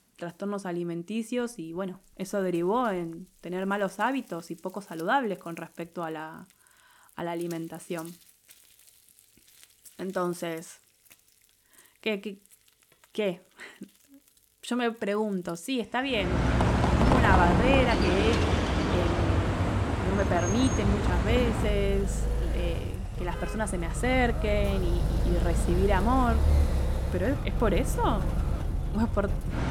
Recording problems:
traffic noise; very loud; from 16 s on; 2 dB above the speech
household noises; faint; throughout; 25 dB below the speech

